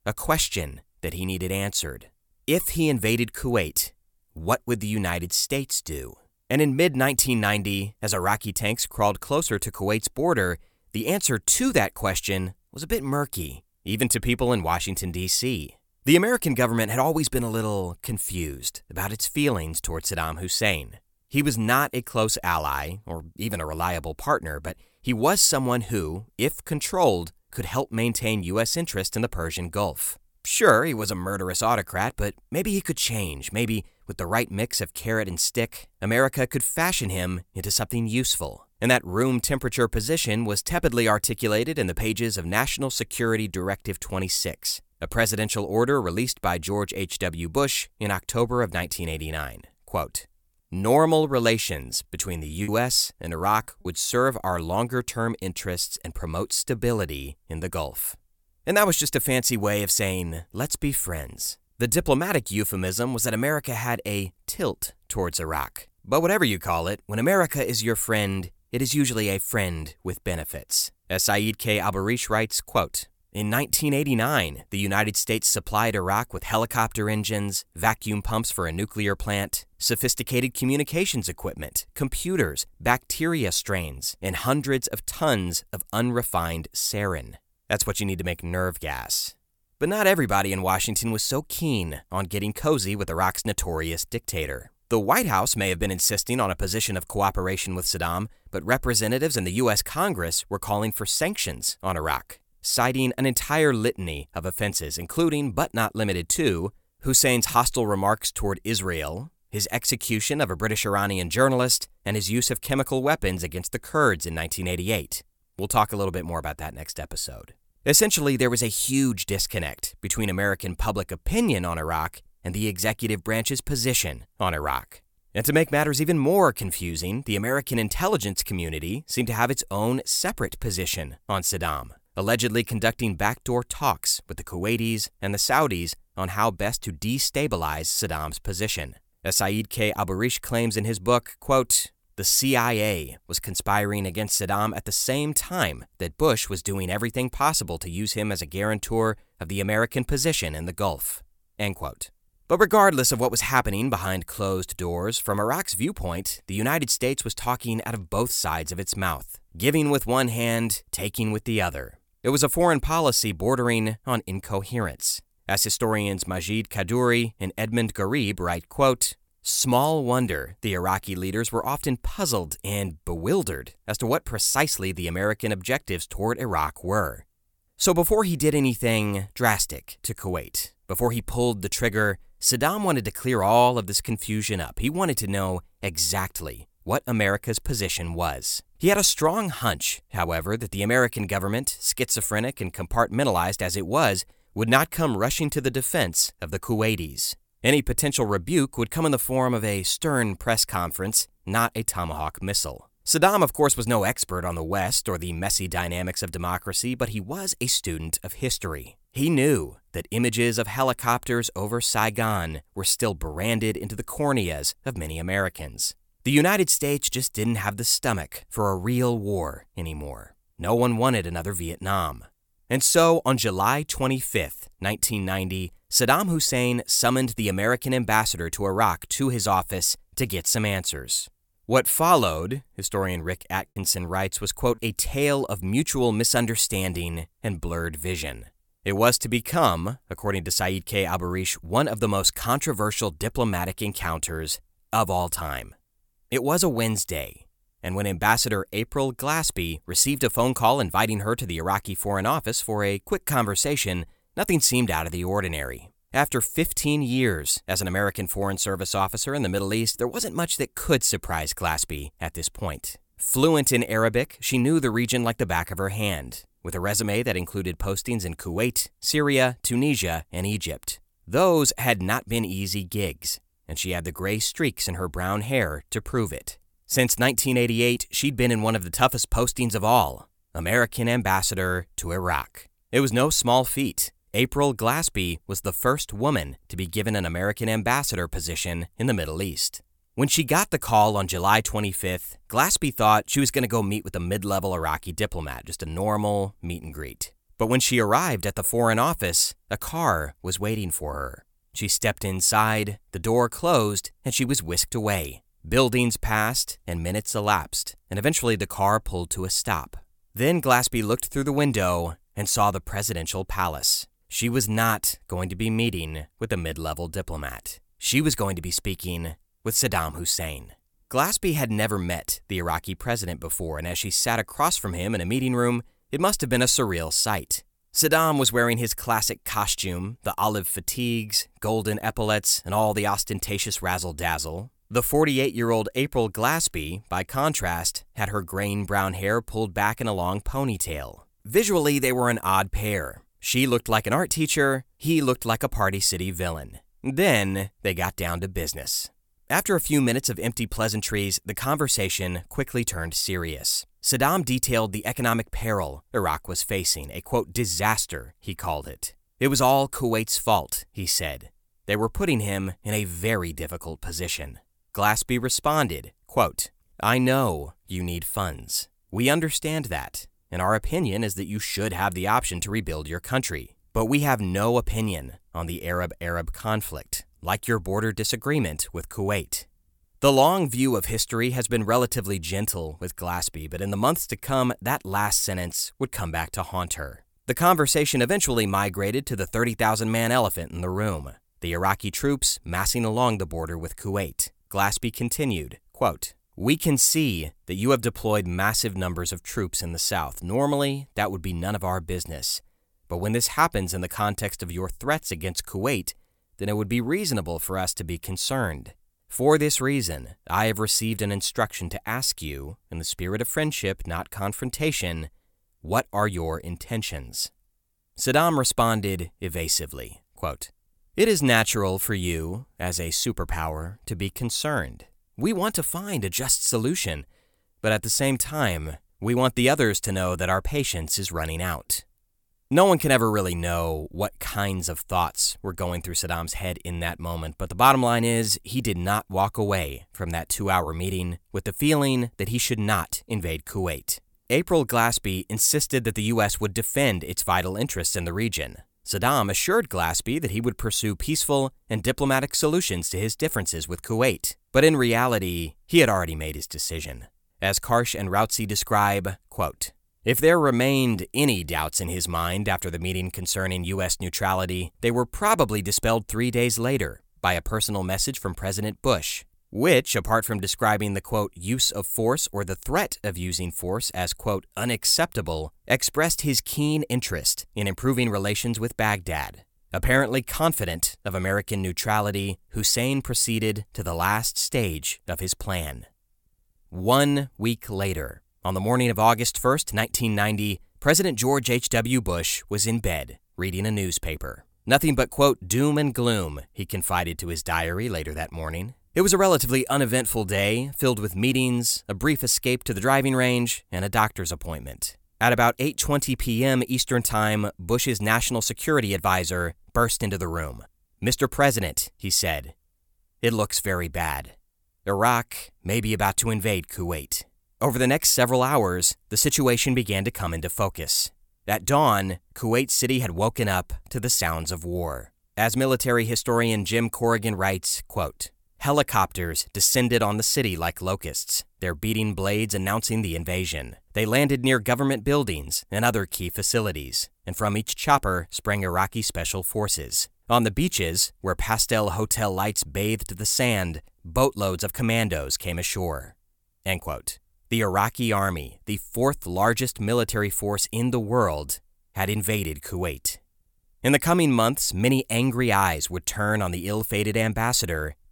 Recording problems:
choppy; occasionally; from 53 to 54 s and at 3:54; 4% of the speech affected

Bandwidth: 18 kHz